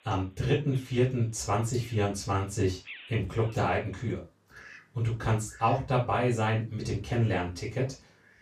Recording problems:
off-mic speech; far
room echo; slight; dies away in 0.2 s
animal sounds; faint; throughout; 20 dB below the speech

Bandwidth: 14.5 kHz